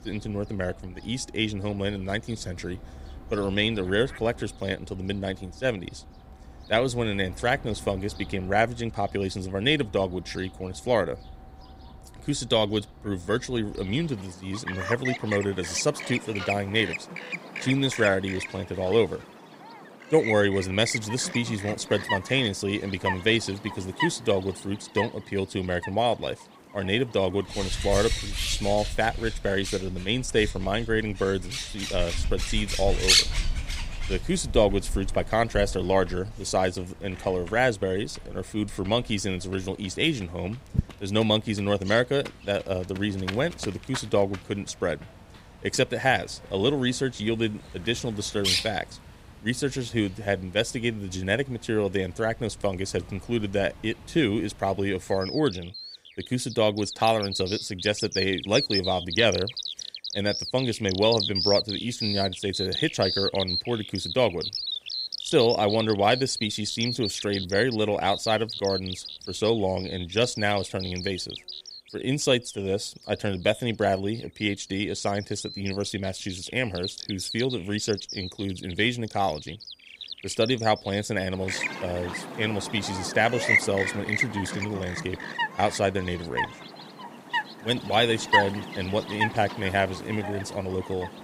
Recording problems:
animal sounds; loud; throughout; 4 dB below the speech

